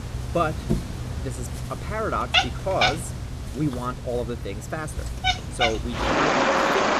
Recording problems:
animal sounds; very loud; throughout; 4 dB above the speech

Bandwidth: 14.5 kHz